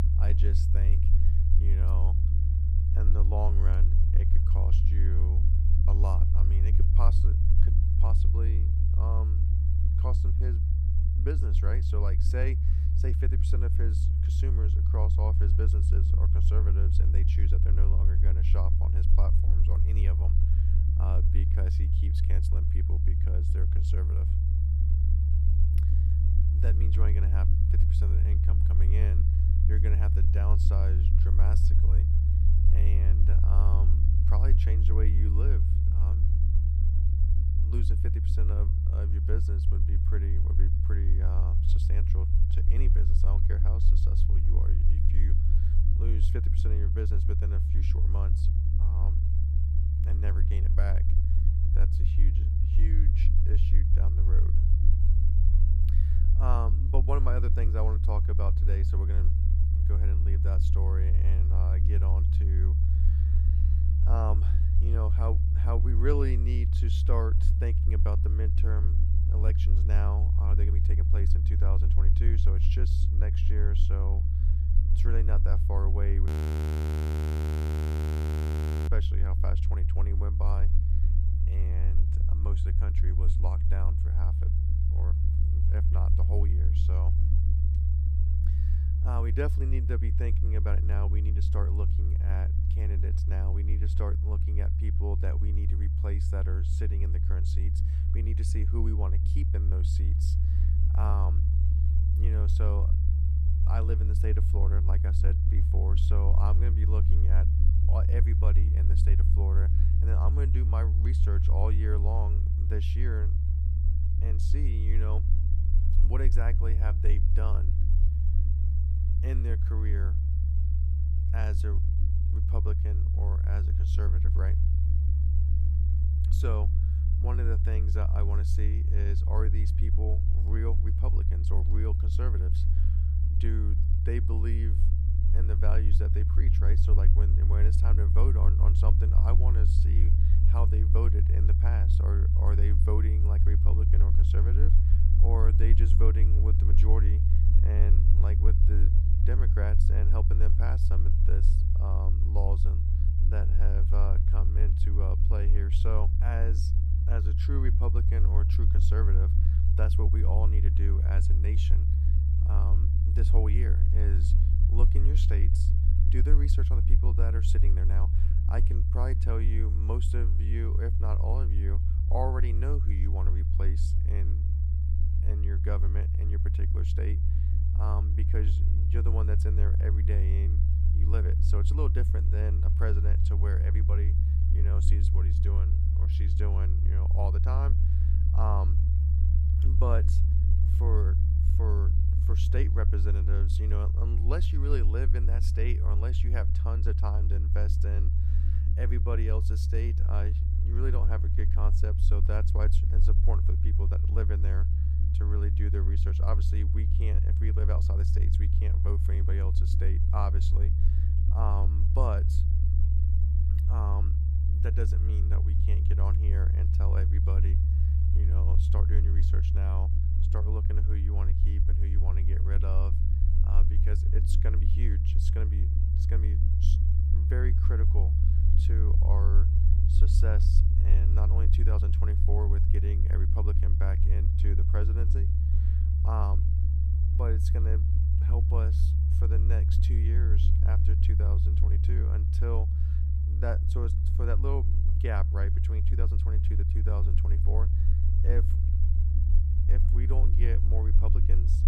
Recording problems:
low rumble; loud; throughout; 1 dB below the speech
audio freezing; at 1:16 for 2.5 s

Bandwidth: 15.5 kHz